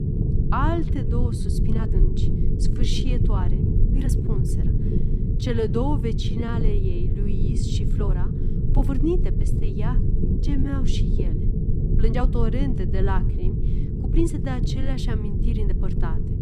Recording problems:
low rumble; loud; throughout; 4 dB below the speech
uneven, jittery; strongly; from 0.5 to 16 s

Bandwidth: 14.5 kHz